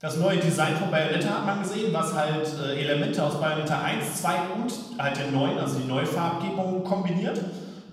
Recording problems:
off-mic speech; far
room echo; noticeable; dies away in 1.3 s

